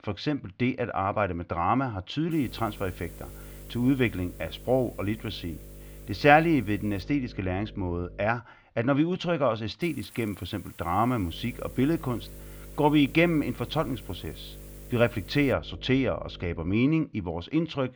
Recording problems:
muffled; slightly; fading above 3.5 kHz
electrical hum; faint; from 2.5 to 8.5 s and from 11 to 17 s; 50 Hz, 25 dB below the speech
hiss; faint; from 2.5 to 7 s and from 10 to 16 s; 20 dB below the speech

